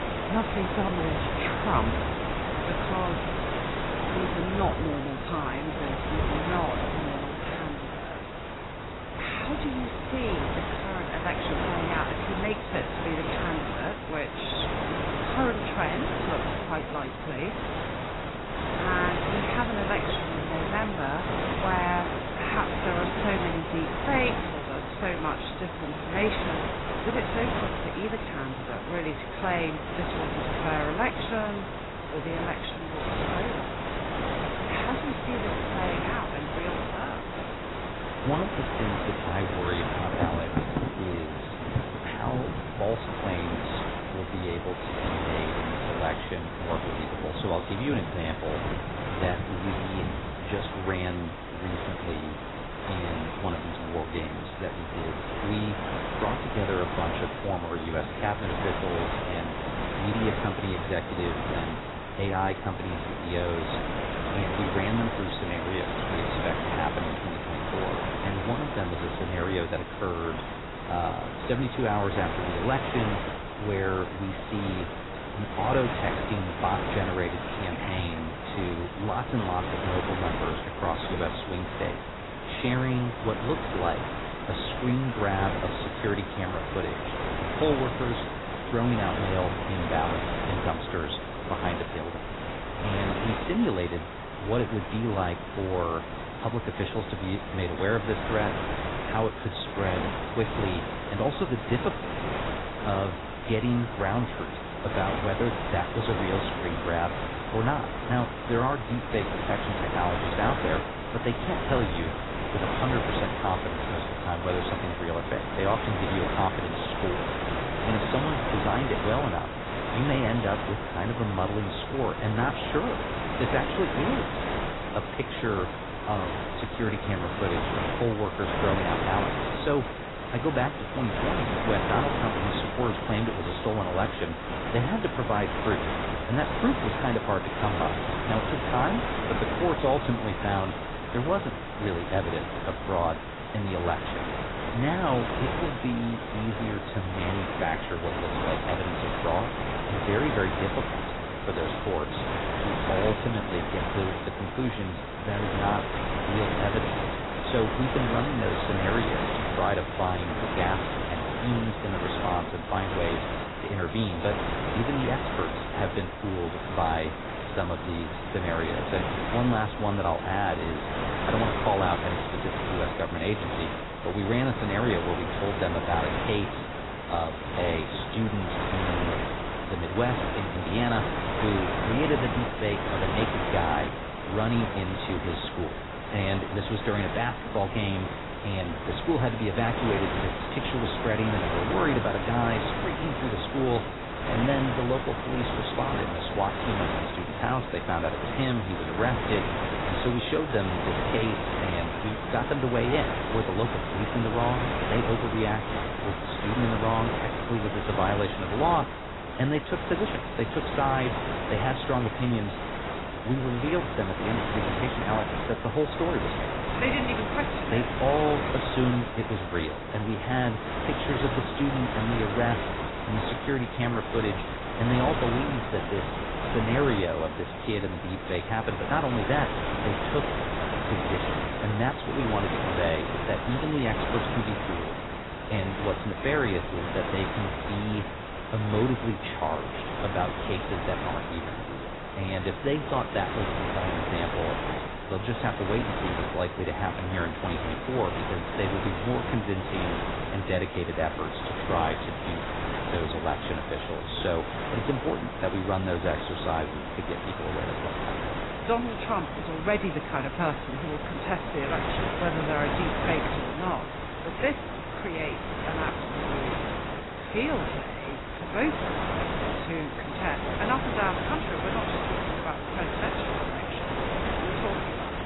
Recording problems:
garbled, watery; badly; nothing above 4 kHz
wind noise on the microphone; heavy; as loud as the speech
rain or running water; noticeable; throughout; 15 dB below the speech

